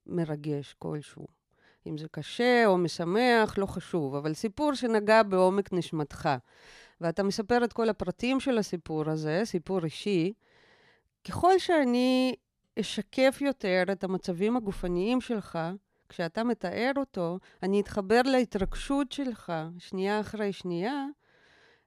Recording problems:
none

